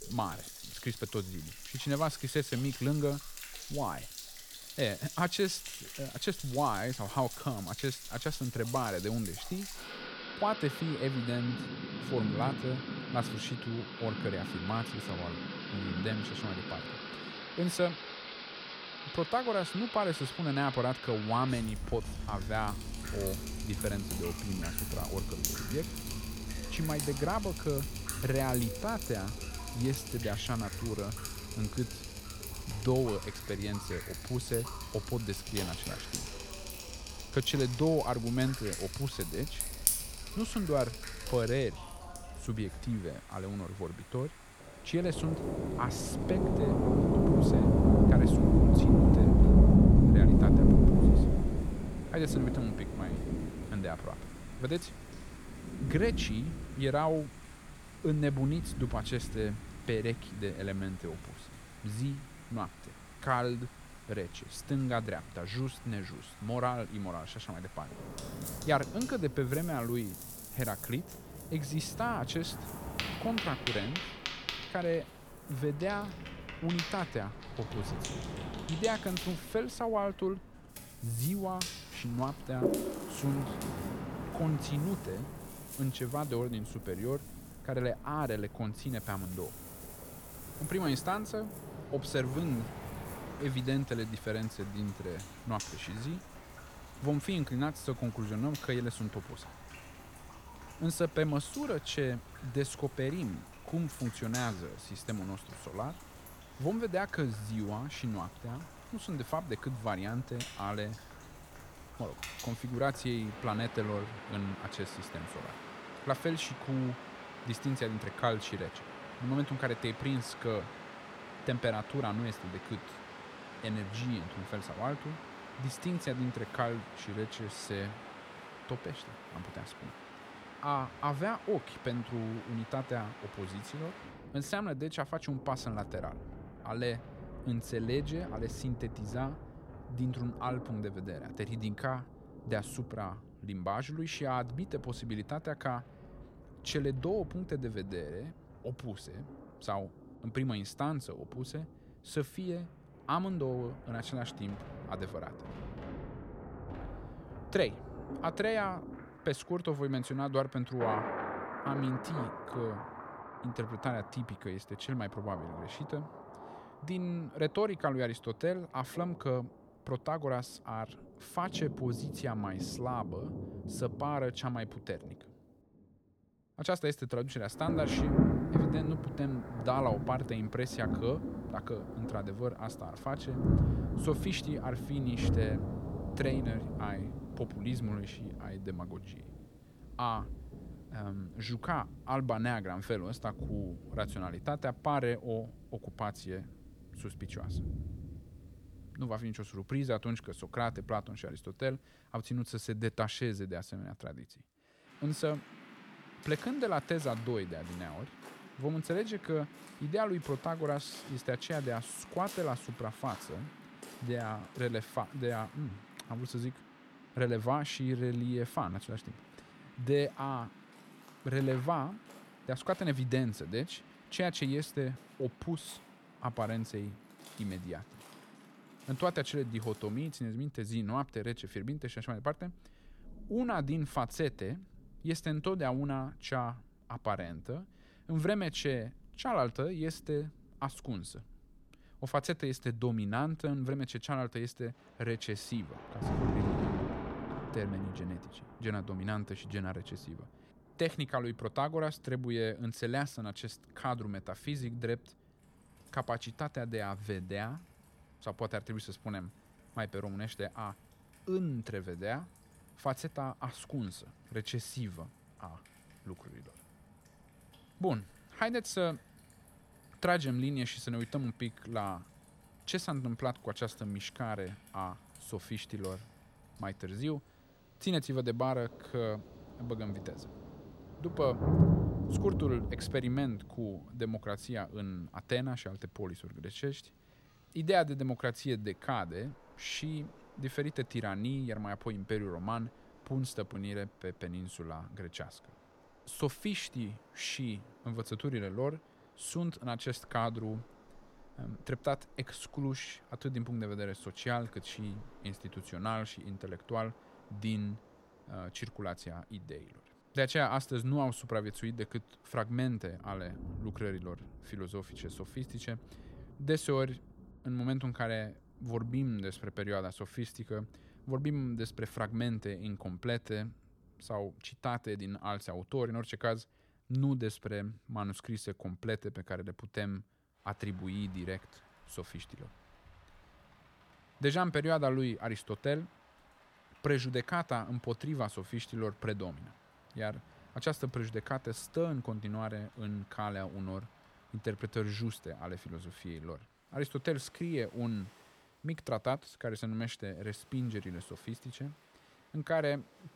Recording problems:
rain or running water; very loud; throughout; 1 dB above the speech

